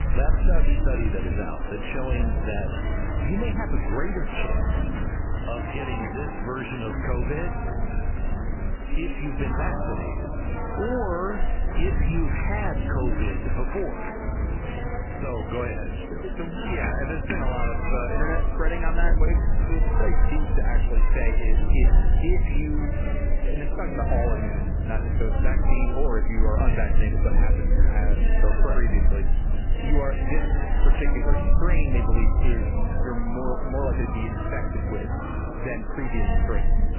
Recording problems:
garbled, watery; badly; nothing above 3 kHz
murmuring crowd; loud; throughout; 2 dB below the speech
low rumble; noticeable; throughout; 10 dB below the speech

